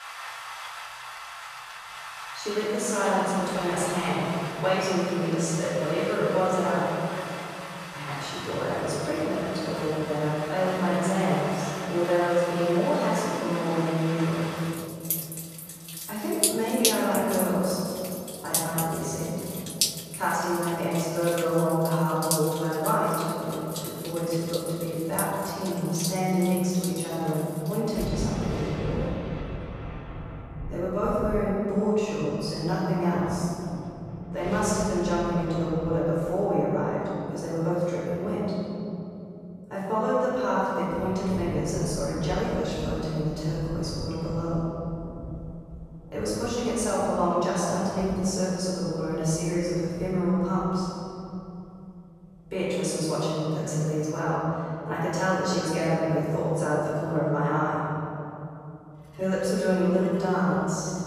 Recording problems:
room echo; strong; dies away in 3 s
off-mic speech; far
rain or running water; loud; throughout; 8 dB below the speech

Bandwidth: 14.5 kHz